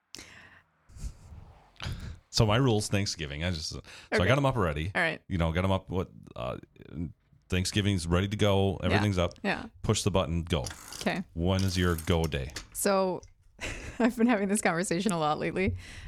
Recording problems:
traffic noise; noticeable; throughout; 15 dB below the speech

